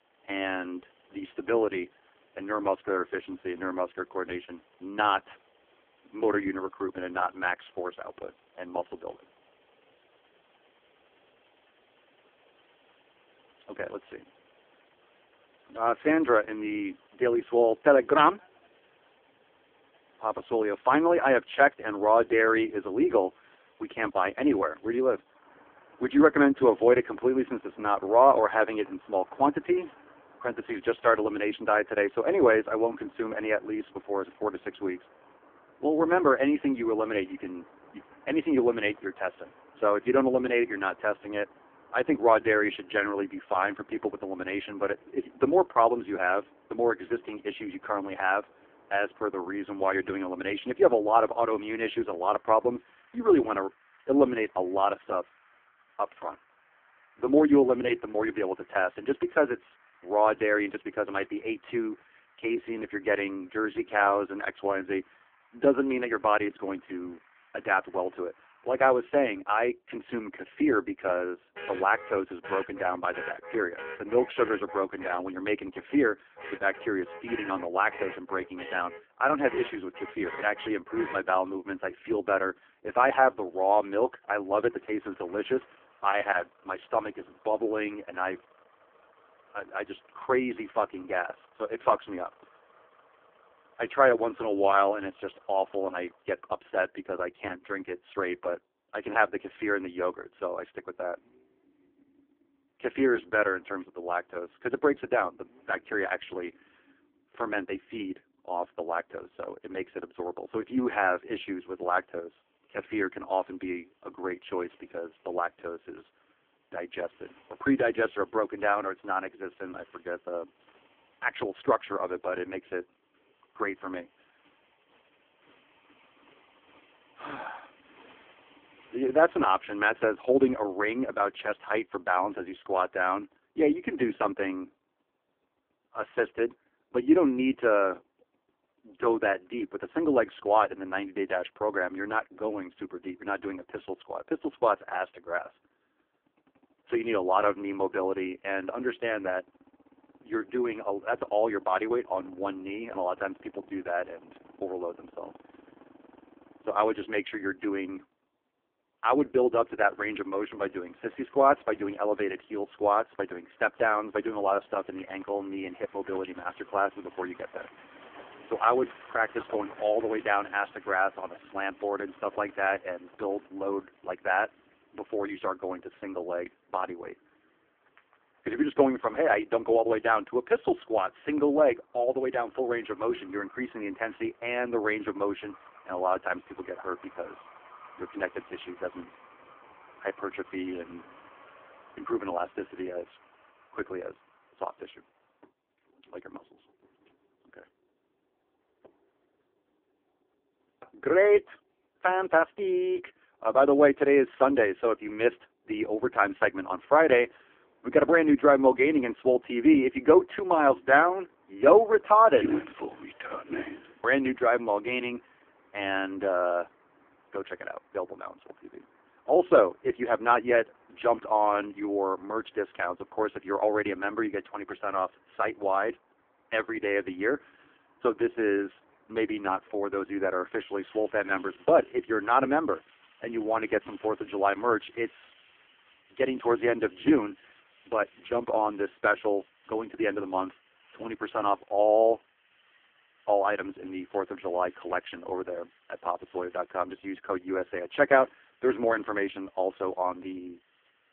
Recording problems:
phone-call audio; poor line
traffic noise; faint; throughout; 25 dB below the speech

